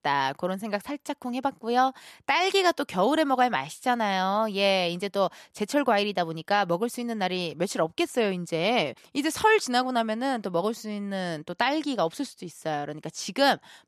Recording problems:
none

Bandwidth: 13.5 kHz